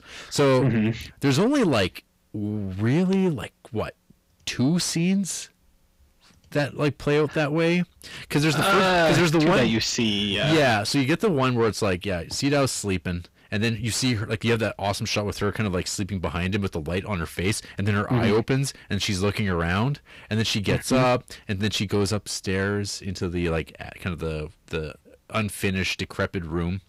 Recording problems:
distortion; heavy; 7 dB below the speech

